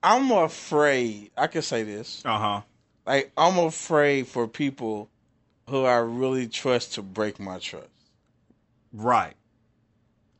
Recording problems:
high frequencies cut off; noticeable; nothing above 8 kHz

